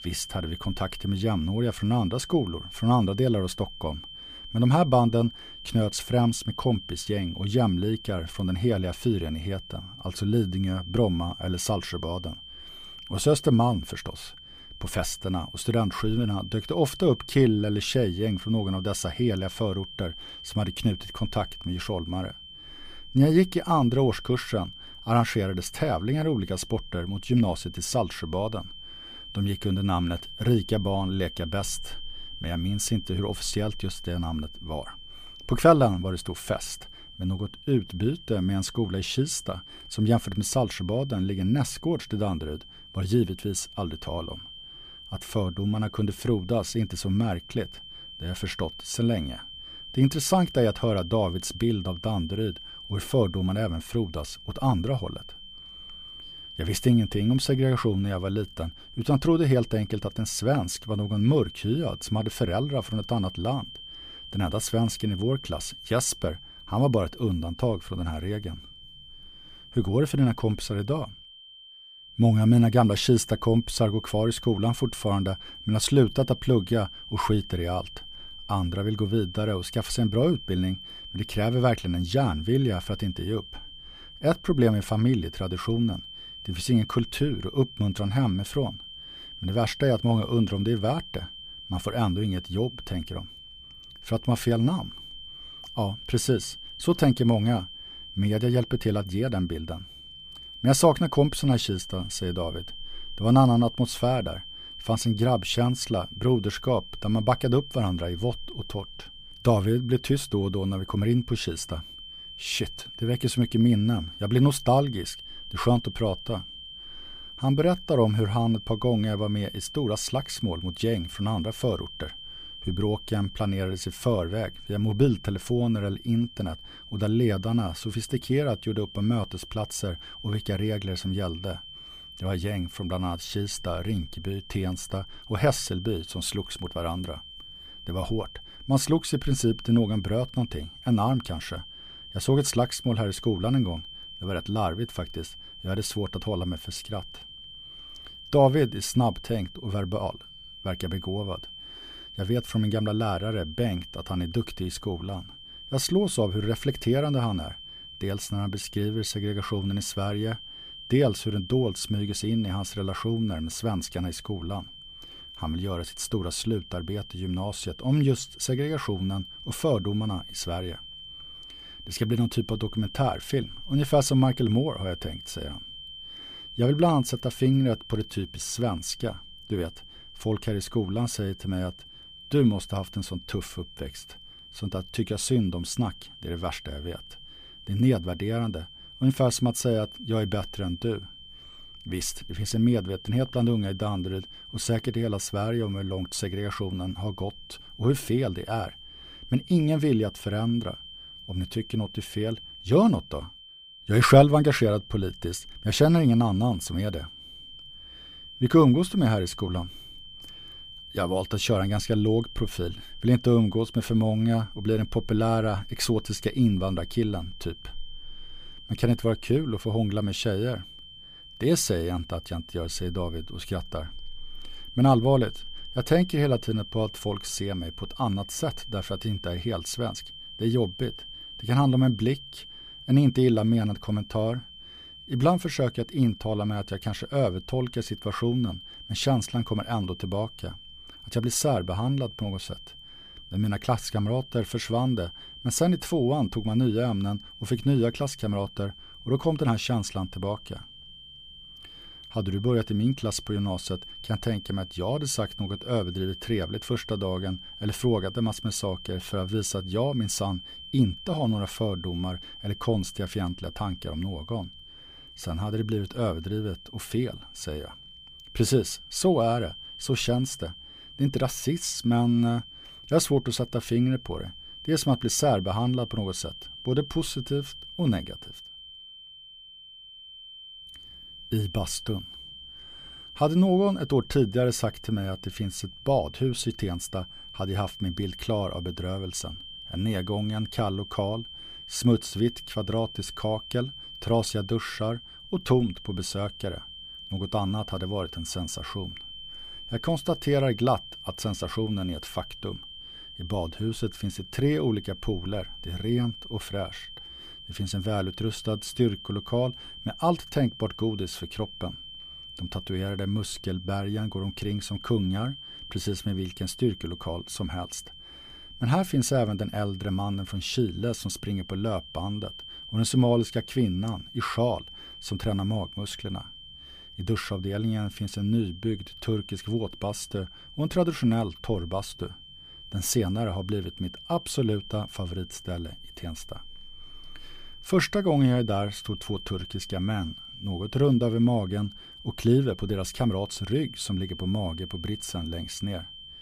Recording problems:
high-pitched whine; noticeable; throughout; 3 kHz, 15 dB below the speech

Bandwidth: 15 kHz